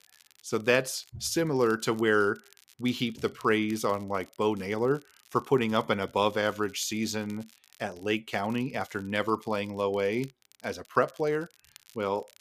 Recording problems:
crackle, like an old record; faint; 25 dB below the speech

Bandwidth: 14.5 kHz